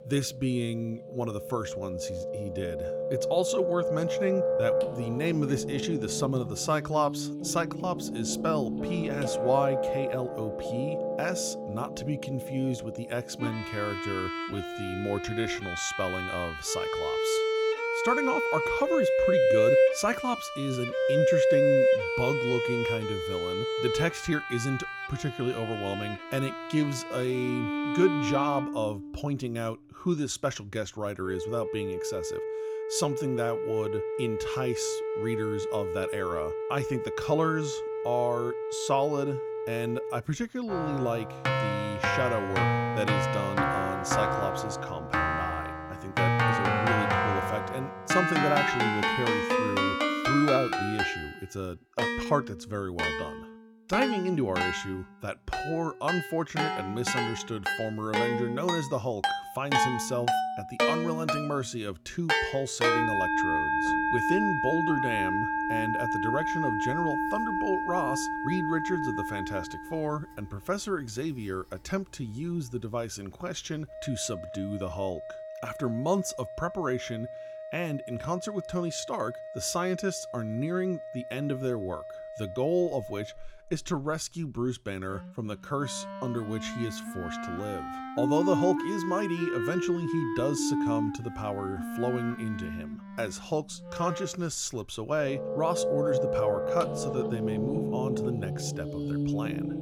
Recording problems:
background music; very loud; throughout; 2 dB above the speech

